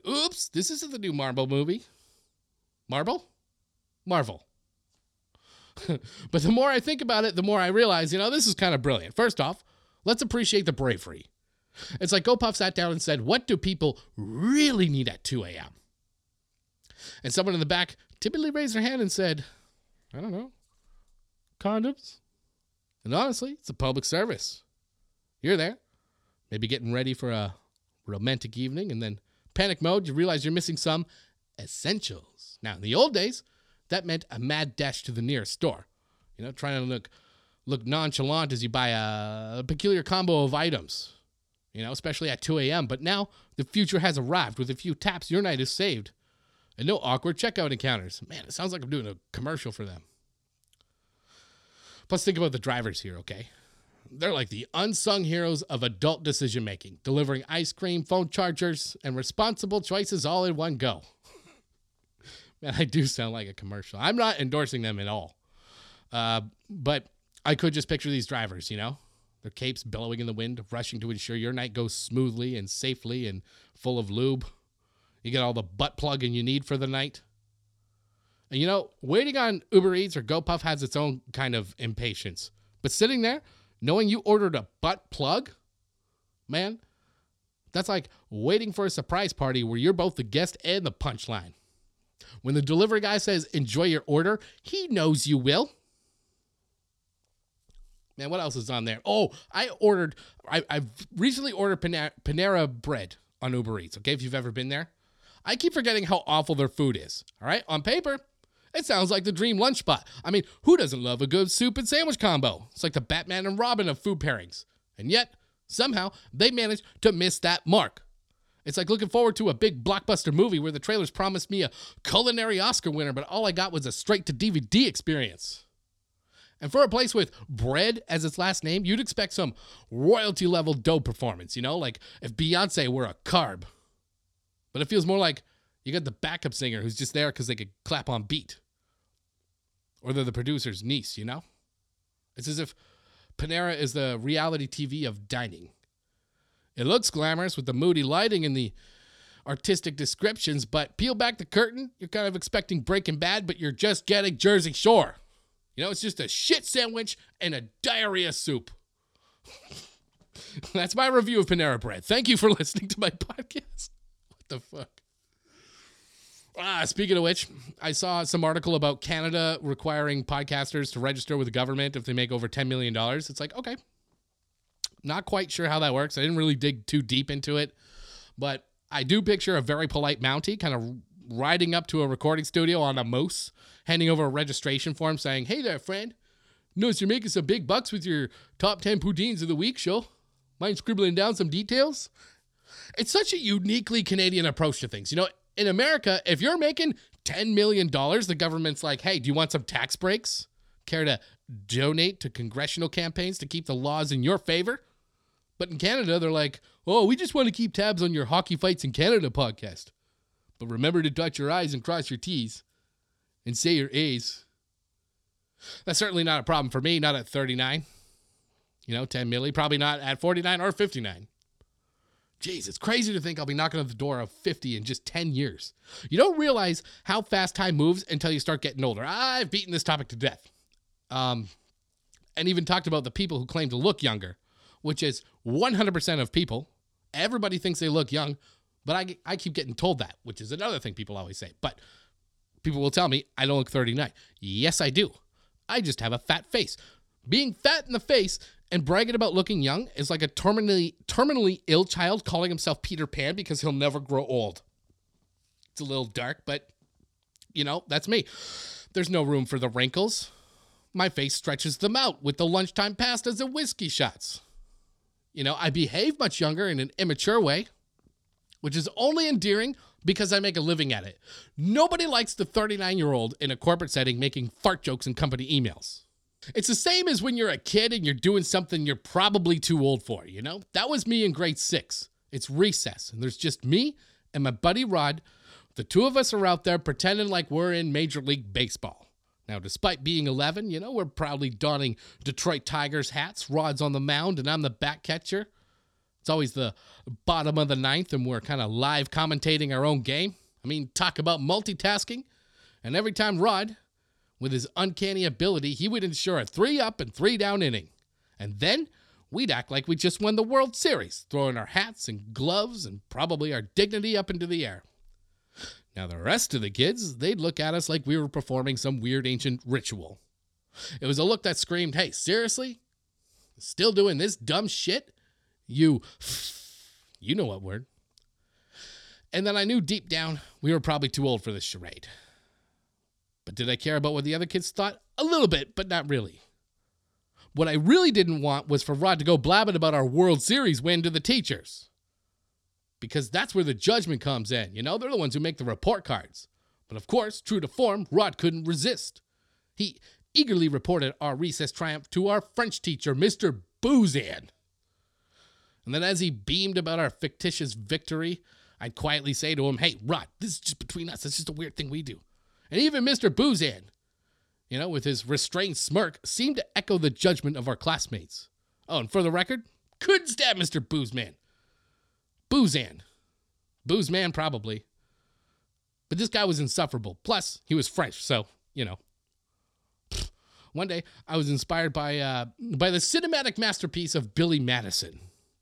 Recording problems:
none

